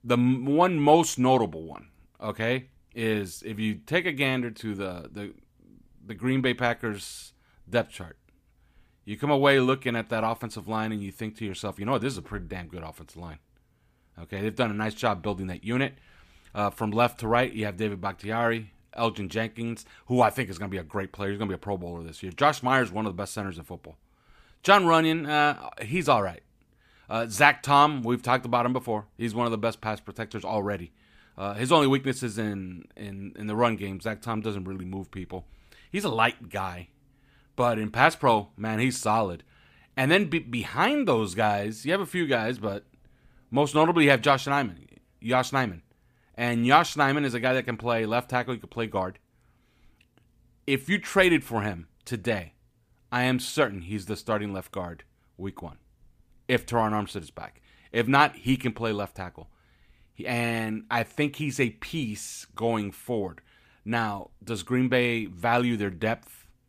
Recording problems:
none

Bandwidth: 15 kHz